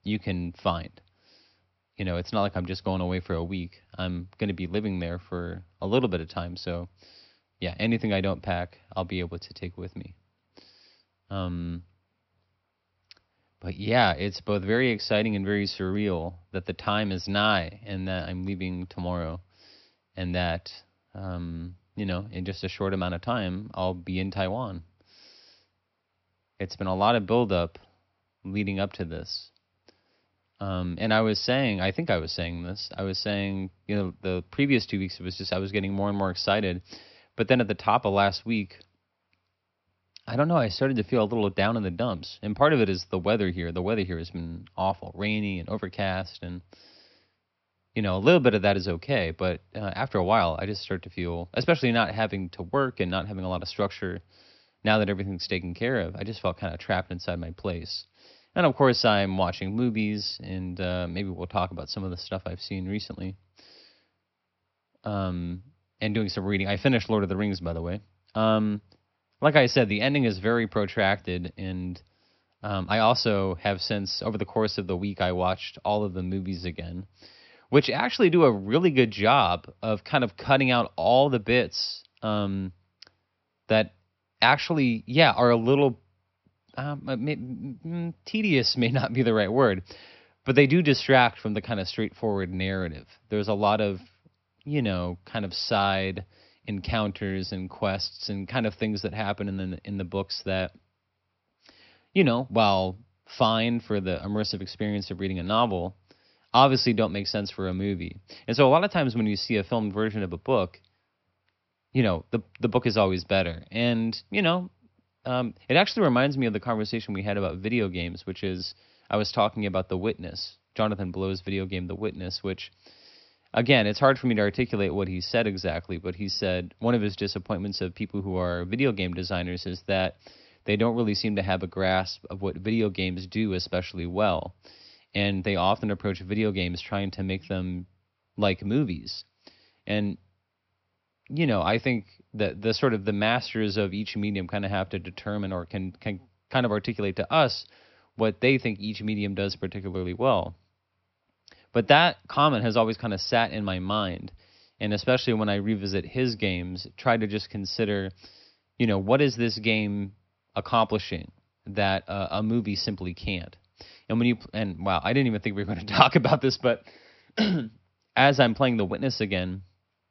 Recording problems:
high frequencies cut off; noticeable; nothing above 5.5 kHz

